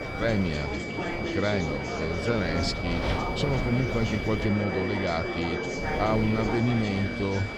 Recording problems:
wind noise on the microphone; heavy; 9 dB below the speech
high-pitched whine; loud; throughout; 2.5 kHz, 8 dB below the speech
chatter from many people; loud; throughout; 4 dB below the speech

